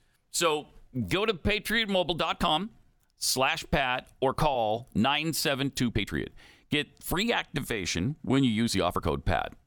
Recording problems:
uneven, jittery; strongly; from 0.5 to 9 s

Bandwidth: 18.5 kHz